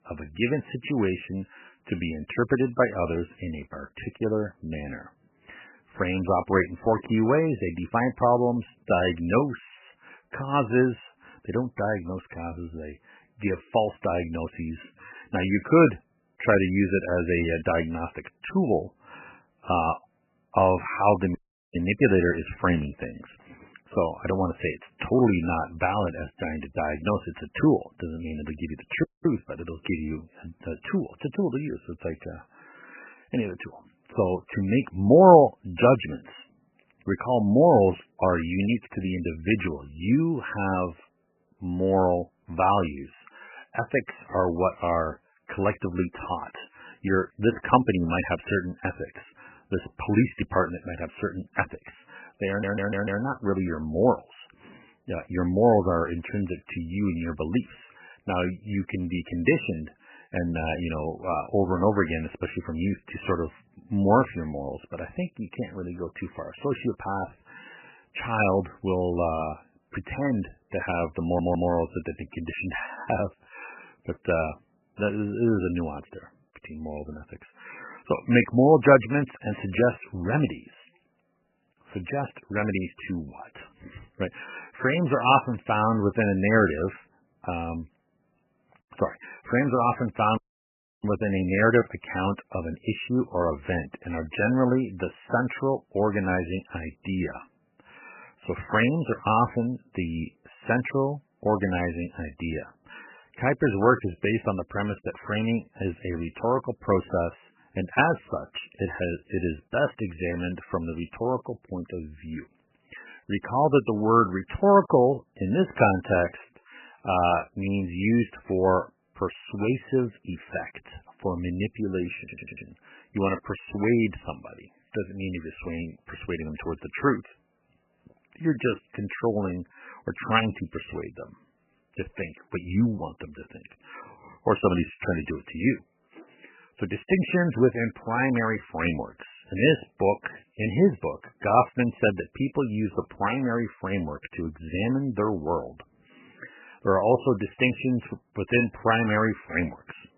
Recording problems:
garbled, watery; badly; nothing above 3 kHz
audio cutting out; at 21 s, at 29 s and at 1:30 for 0.5 s
audio stuttering; at 52 s, at 1:11 and at 2:02

